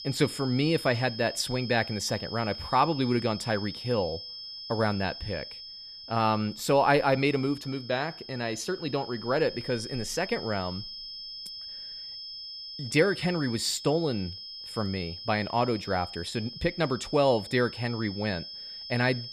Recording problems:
high-pitched whine; noticeable; throughout; 5 kHz, 10 dB below the speech

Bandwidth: 14.5 kHz